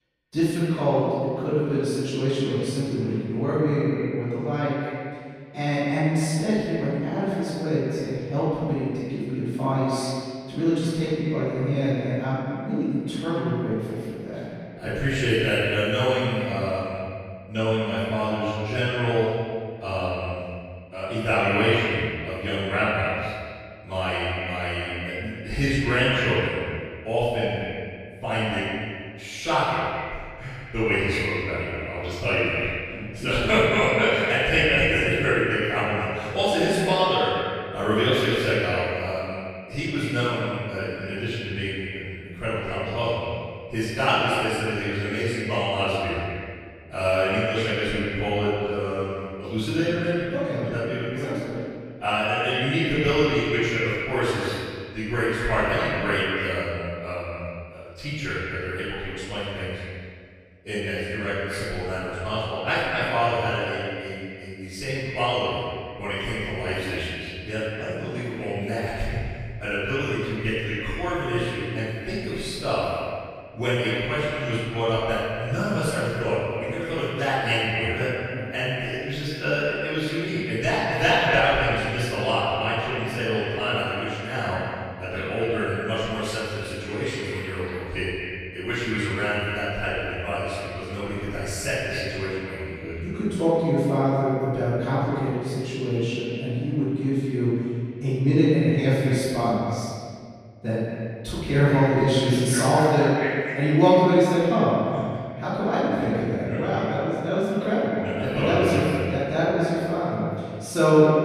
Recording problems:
echo of what is said; strong; throughout; 250 ms later, 9 dB below the speech
room echo; strong; dies away in 1.8 s
off-mic speech; far

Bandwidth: 15 kHz